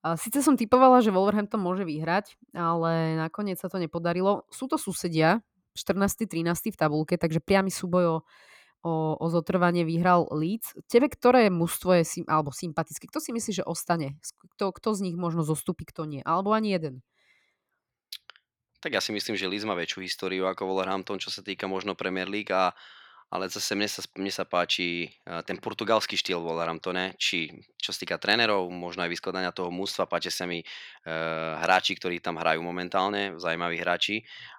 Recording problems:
none

